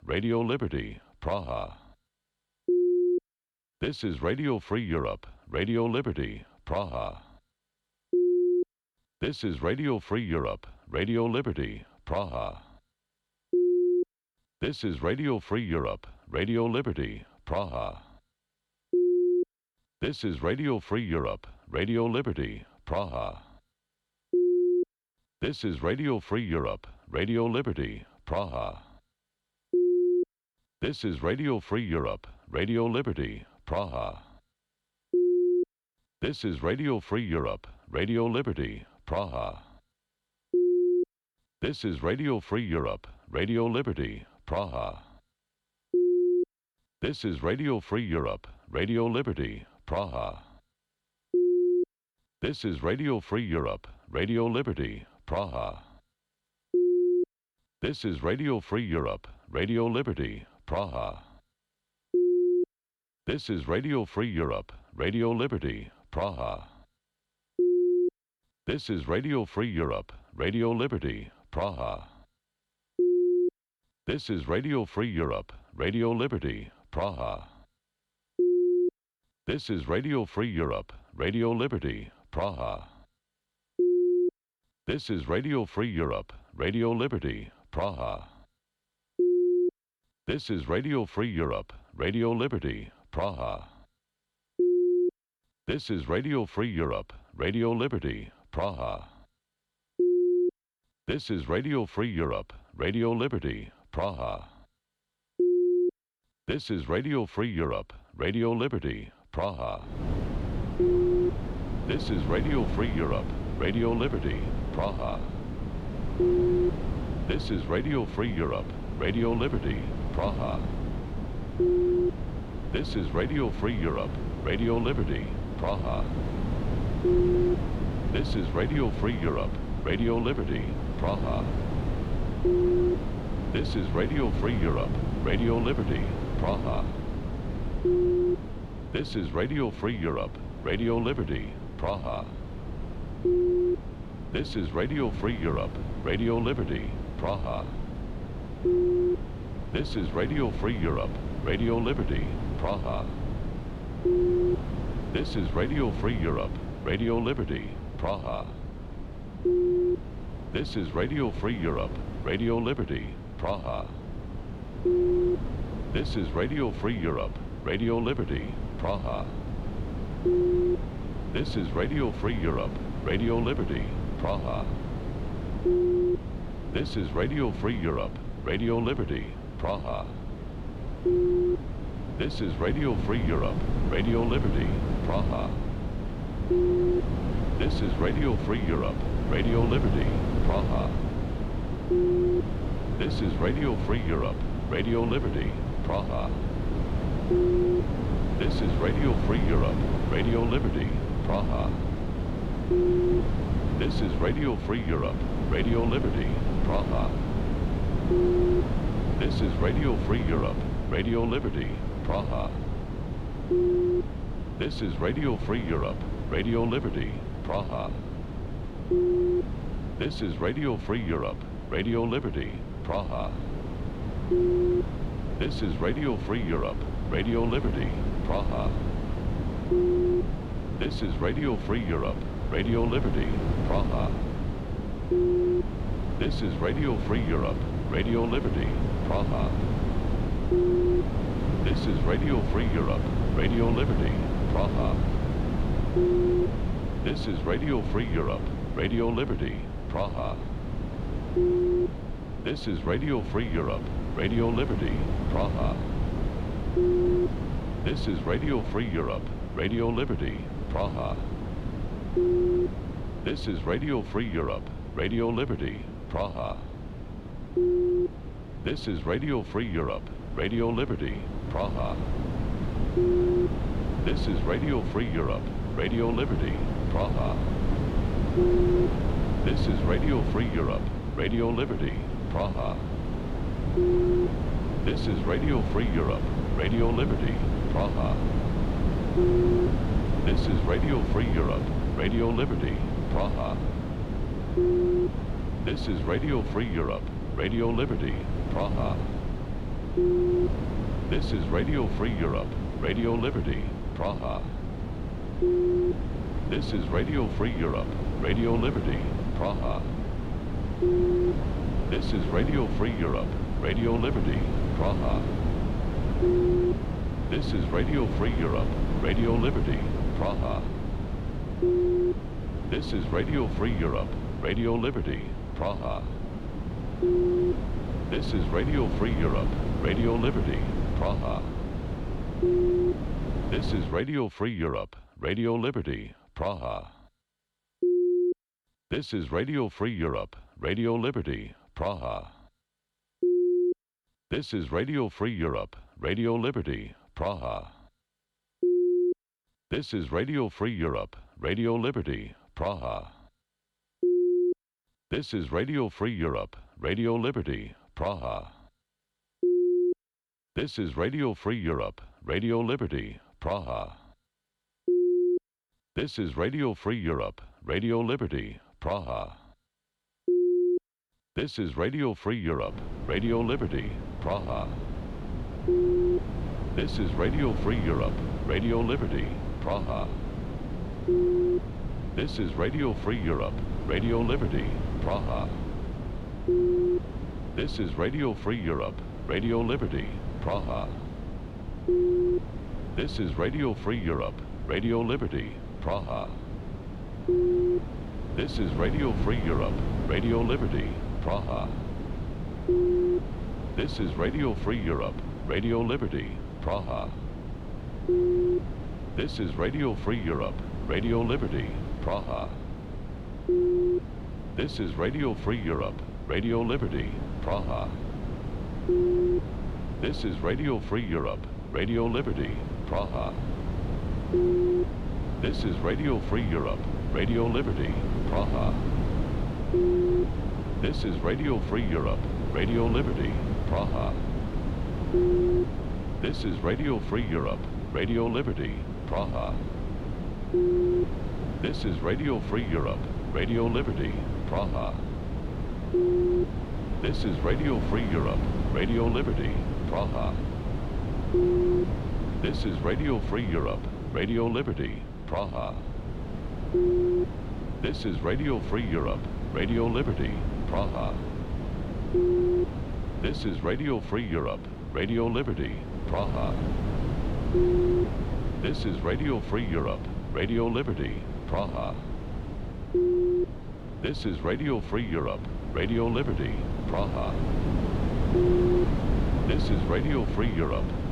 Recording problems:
wind noise on the microphone; heavy; from 1:50 to 5:34 and from 6:13 on; 7 dB below the speech

